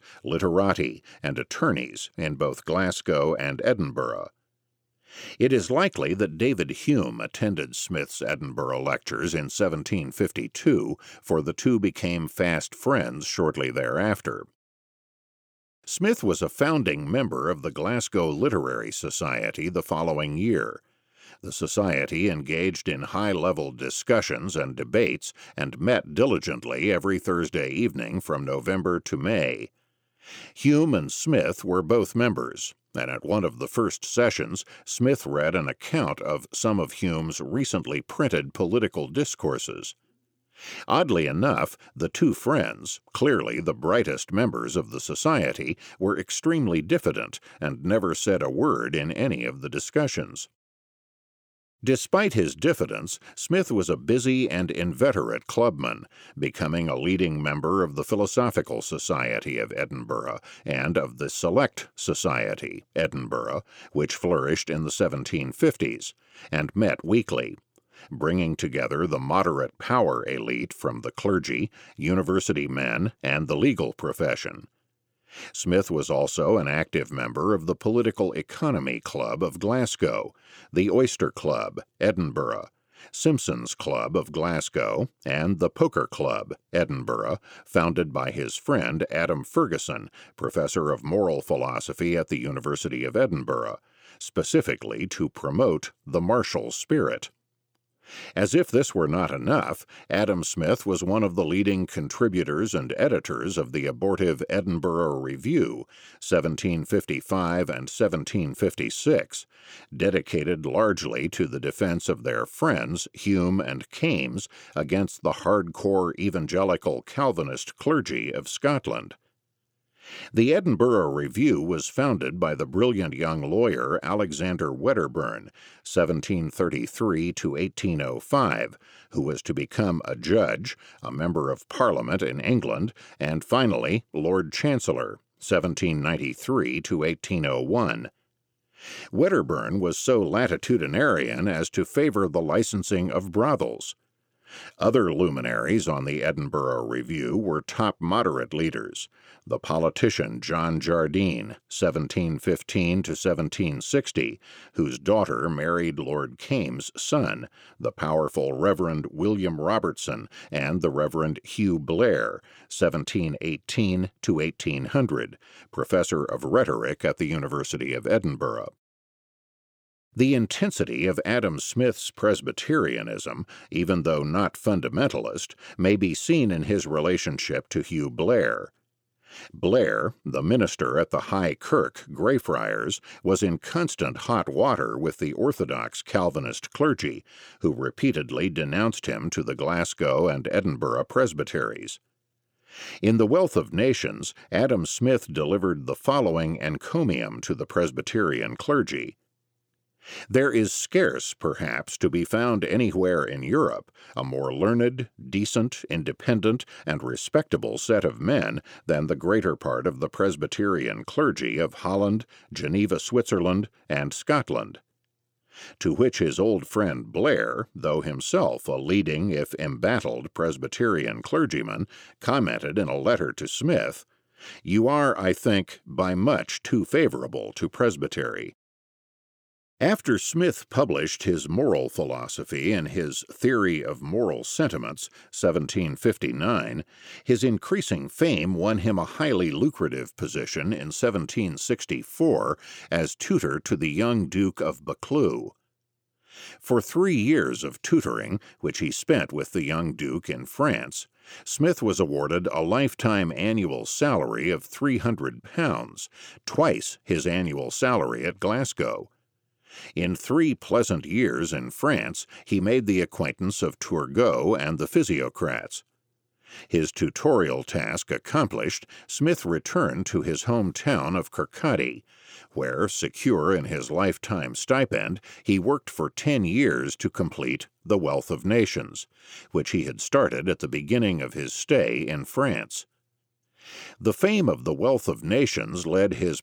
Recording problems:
none

